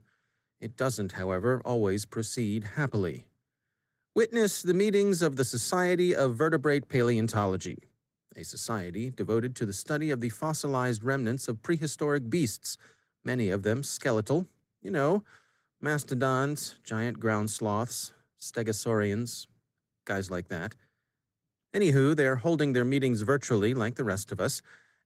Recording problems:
garbled, watery; slightly; nothing above 16 kHz

